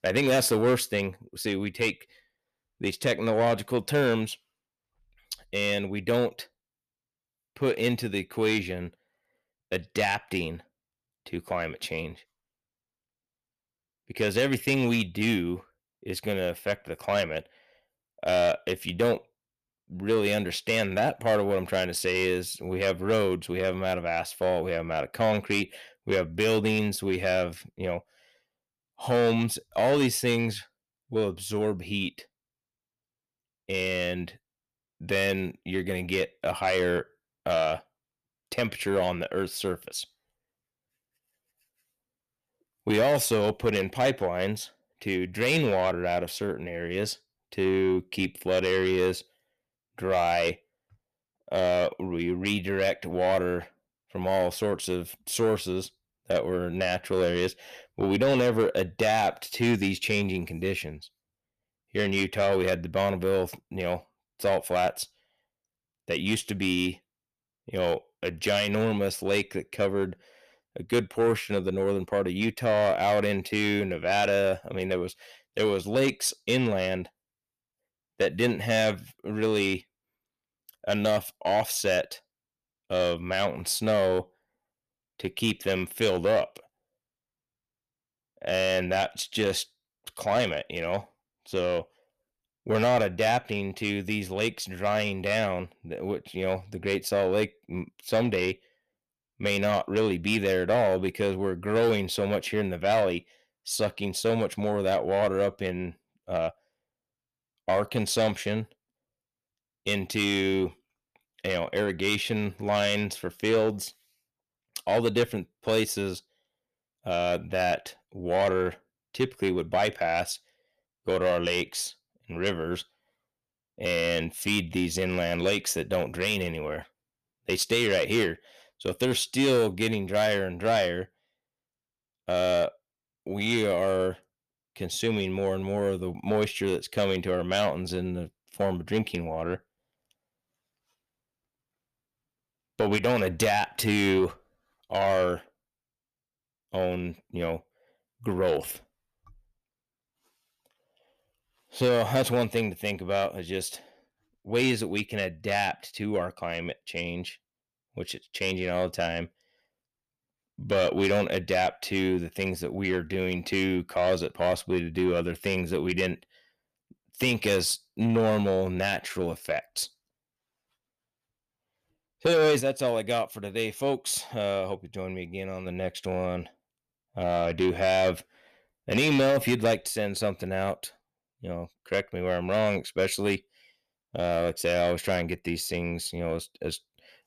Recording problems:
distortion; slight; 10 dB below the speech

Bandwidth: 14.5 kHz